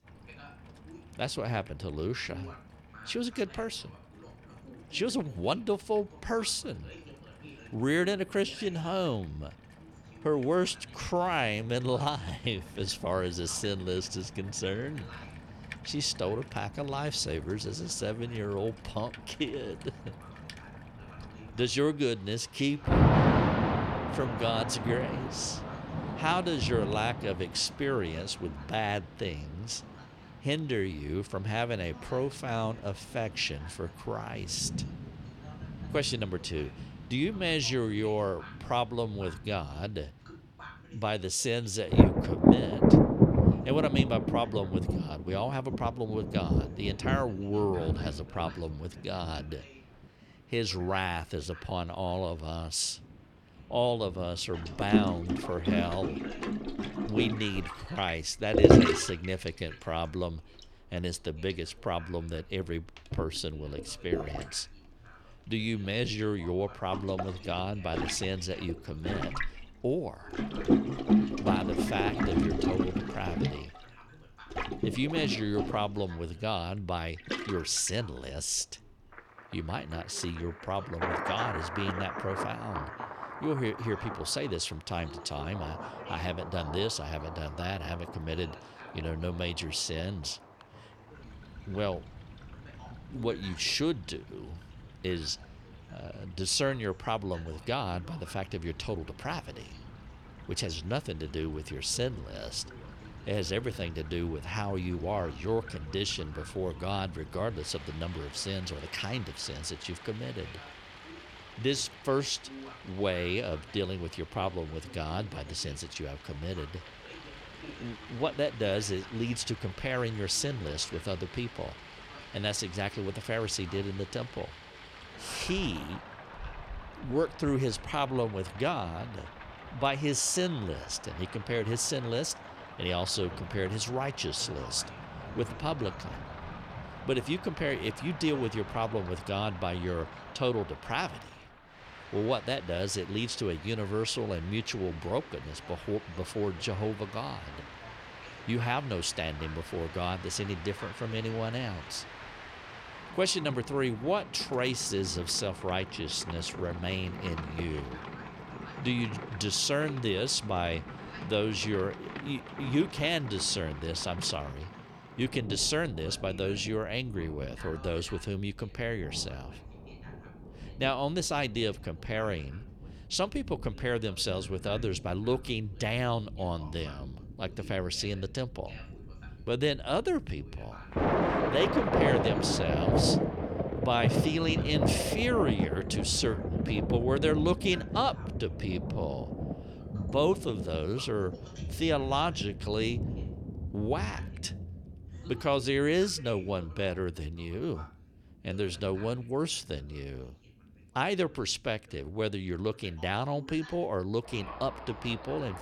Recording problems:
rain or running water; loud; throughout; 1 dB below the speech
voice in the background; faint; throughout; 20 dB below the speech

